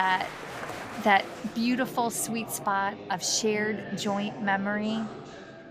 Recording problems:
chatter from many people; noticeable; throughout; 10 dB below the speech
abrupt cut into speech; at the start

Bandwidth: 15 kHz